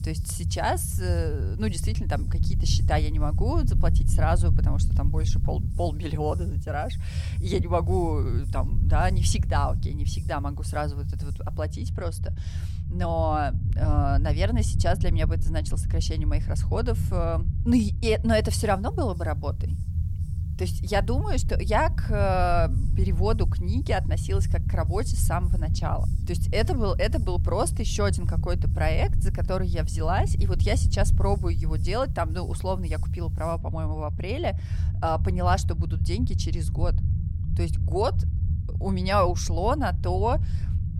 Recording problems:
low rumble; noticeable; throughout; 15 dB below the speech
hiss; faint; until 12 s and from 18 to 34 s; 30 dB below the speech

